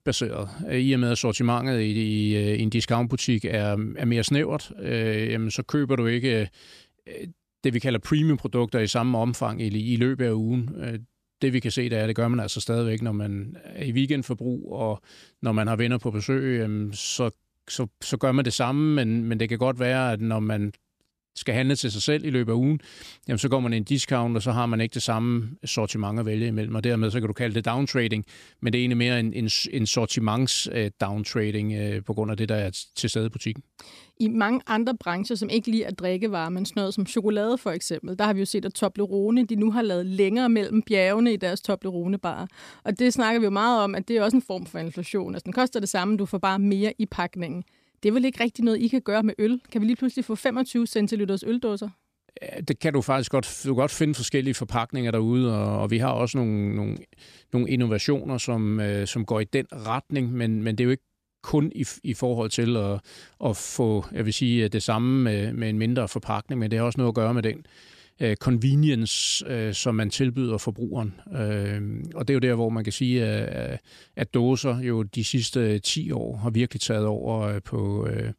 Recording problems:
none

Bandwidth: 14.5 kHz